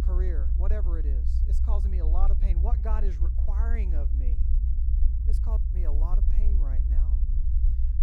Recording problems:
low rumble; loud; throughout; 4 dB below the speech

